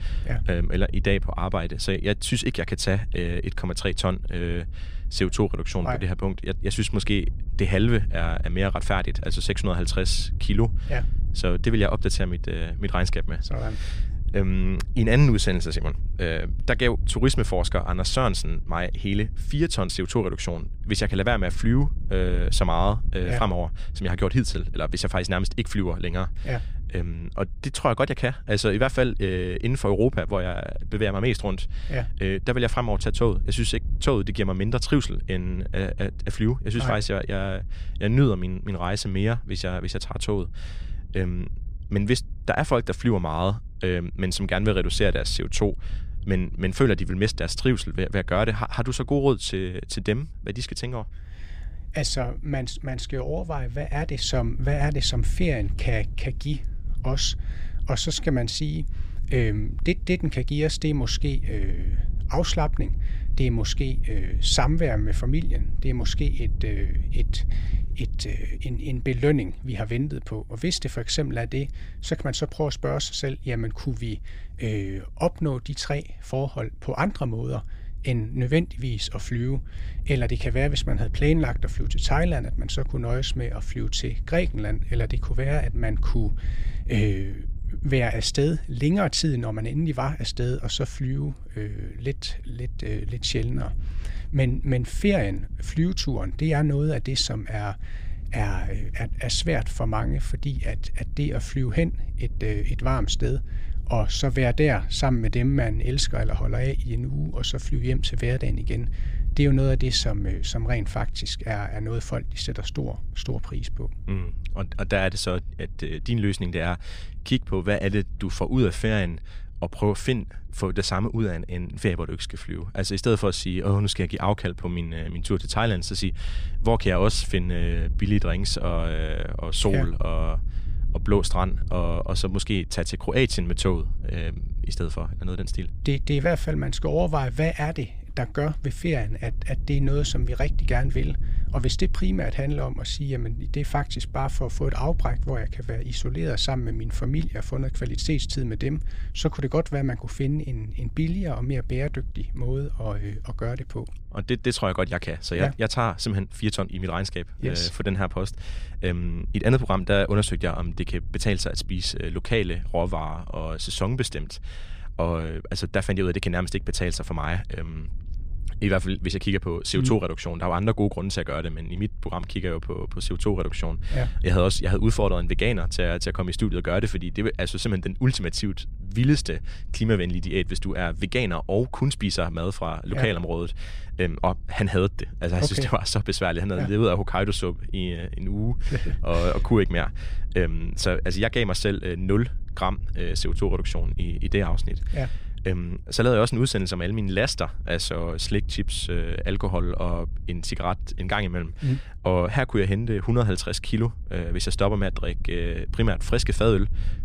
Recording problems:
wind noise on the microphone; occasional gusts; 25 dB below the speech

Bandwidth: 15 kHz